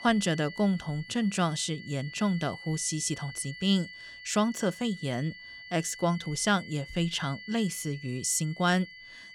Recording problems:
high-pitched whine; noticeable; throughout; 2 kHz, 15 dB below the speech

